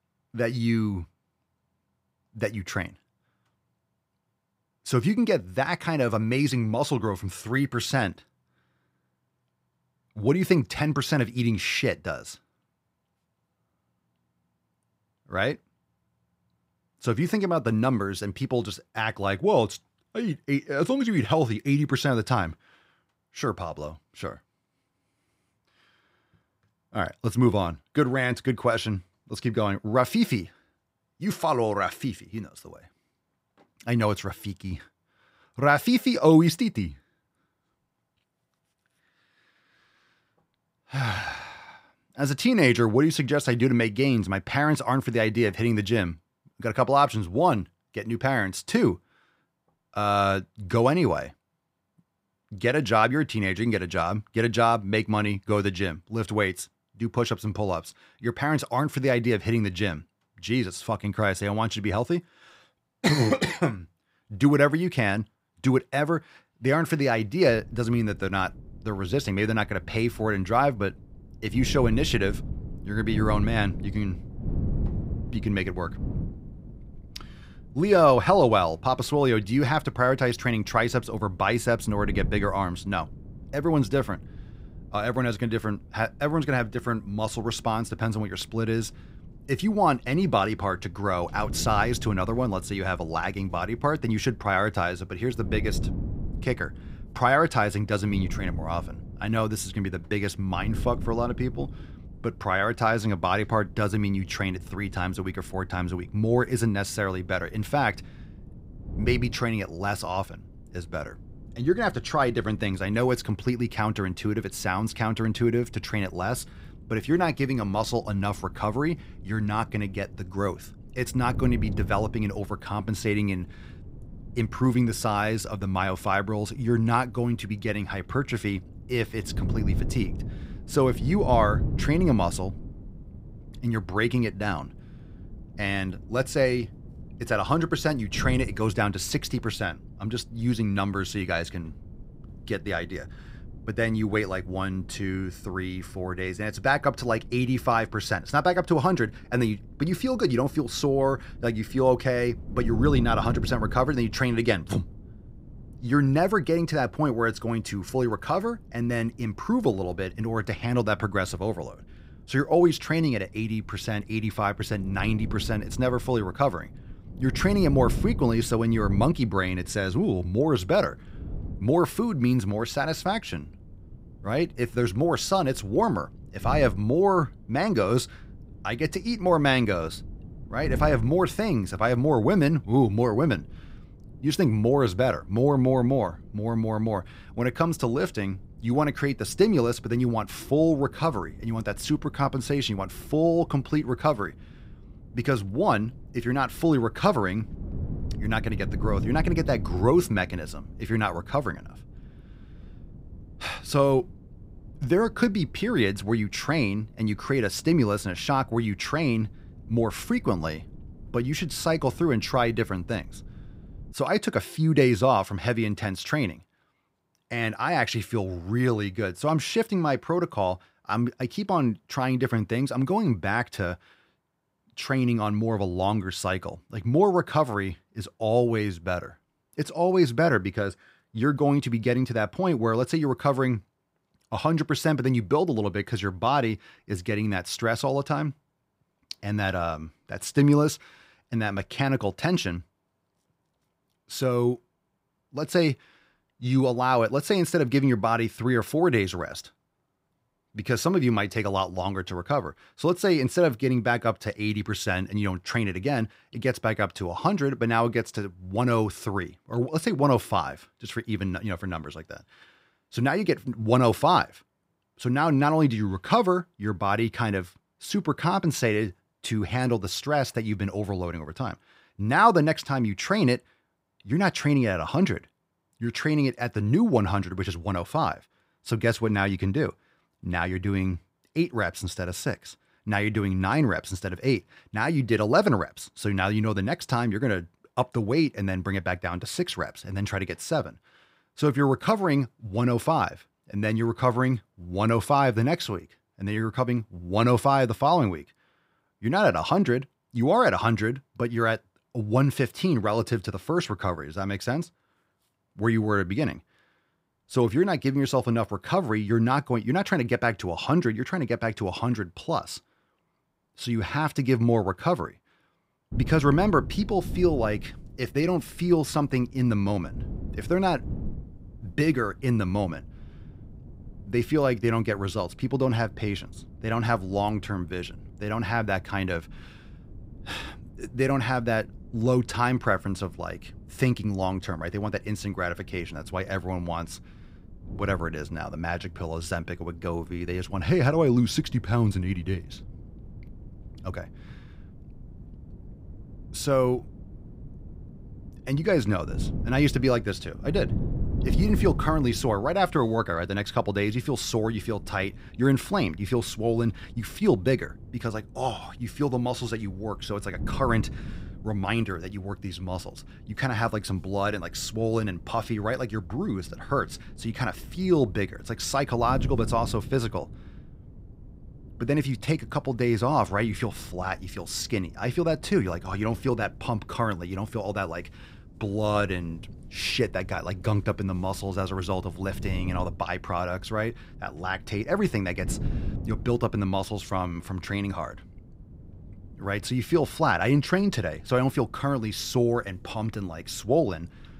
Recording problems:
wind noise on the microphone; occasional gusts; from 1:07 to 3:34 and from 5:16 on; 25 dB below the speech

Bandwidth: 15.5 kHz